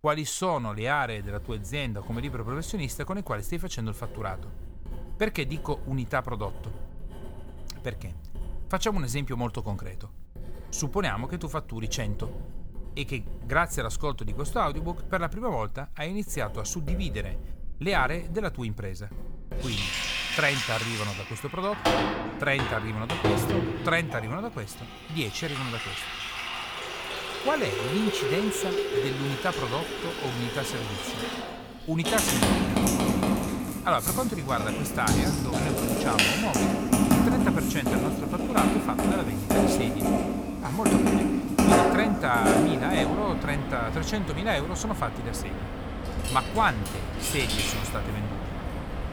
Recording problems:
household noises; very loud; throughout; 3 dB above the speech

